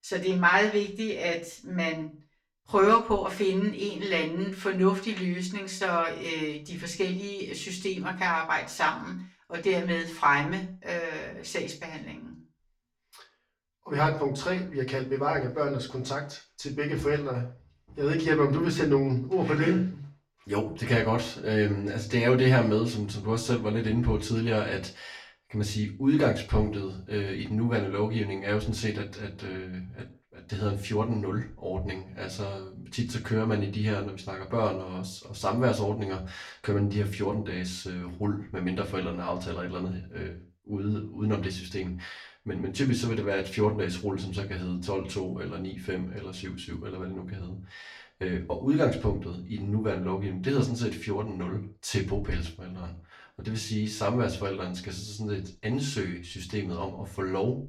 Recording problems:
off-mic speech; far
room echo; very slight; dies away in 0.3 s

